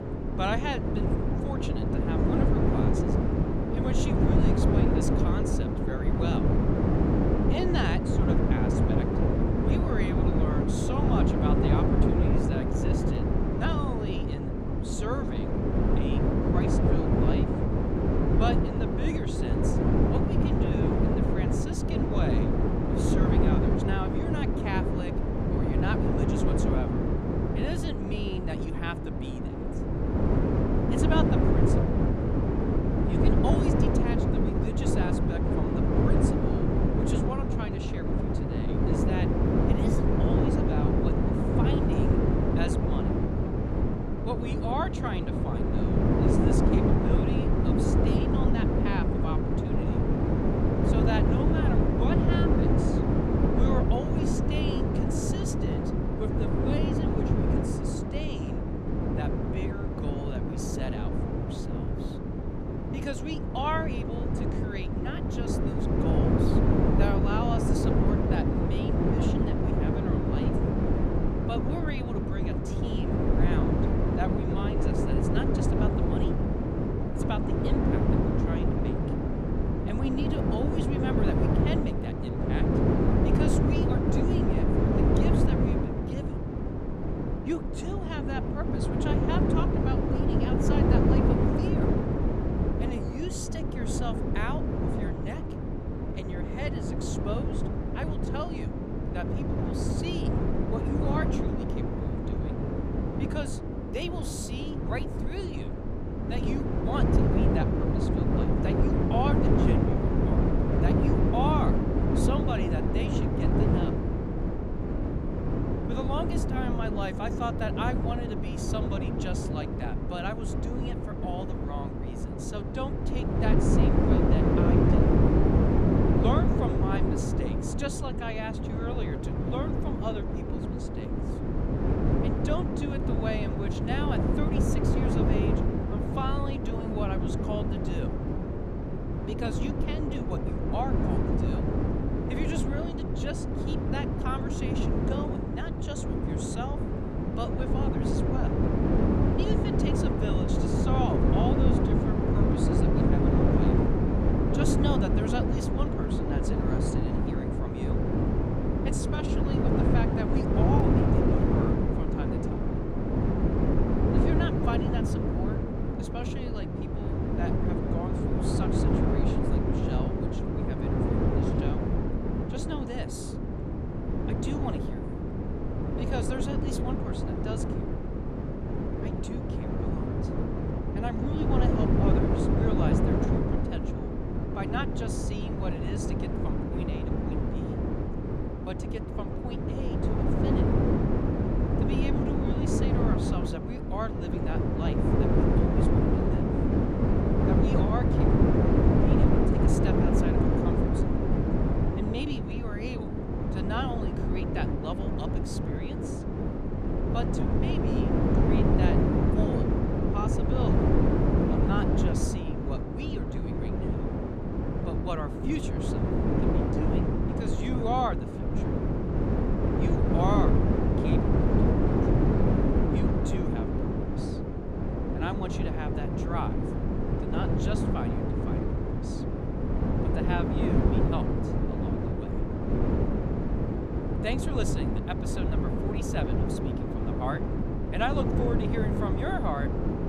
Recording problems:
wind noise on the microphone; heavy; 4 dB above the speech

